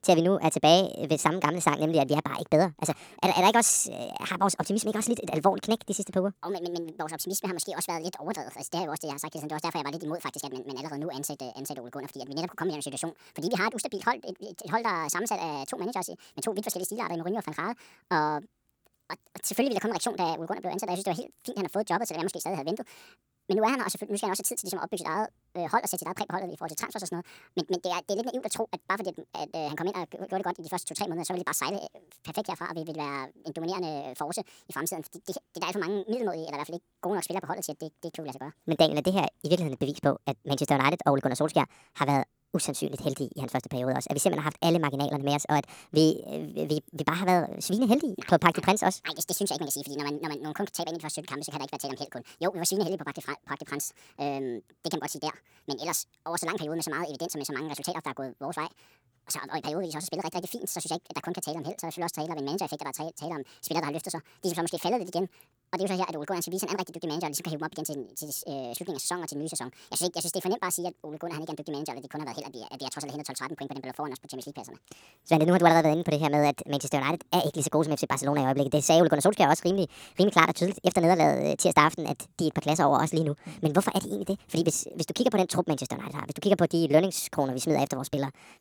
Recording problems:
wrong speed and pitch; too fast and too high; 1.5 times normal speed

